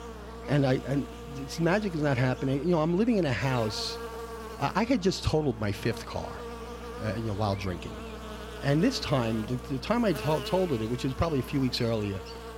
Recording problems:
electrical hum; noticeable; throughout; 60 Hz, 10 dB below the speech

